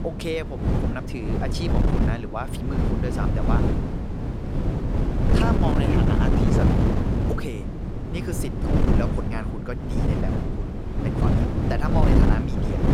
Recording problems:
wind noise on the microphone; heavy; 2 dB above the speech

